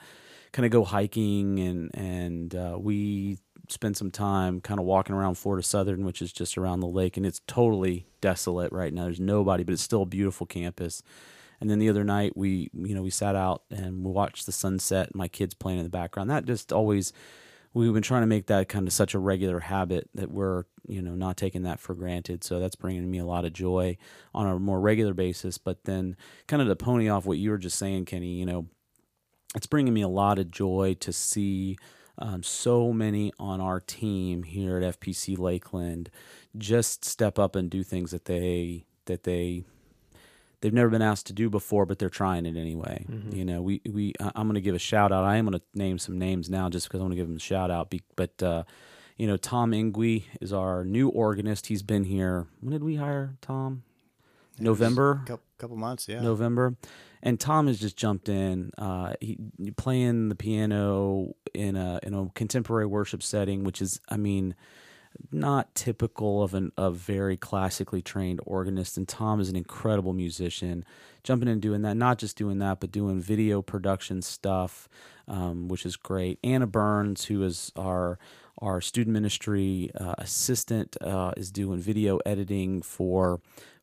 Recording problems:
none

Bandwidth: 15 kHz